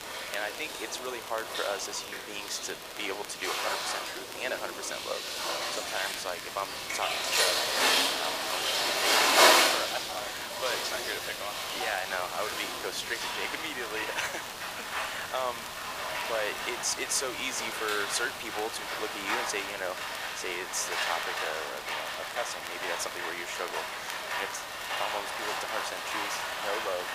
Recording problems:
thin; very; fading below 650 Hz
rain or running water; very loud; throughout; 5 dB above the speech
hiss; loud; throughout; 7 dB below the speech
crackle, like an old record; noticeable; 15 dB below the speech

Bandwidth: 15 kHz